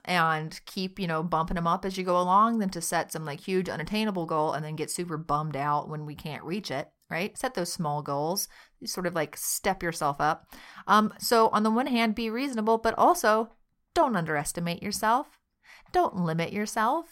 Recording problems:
none

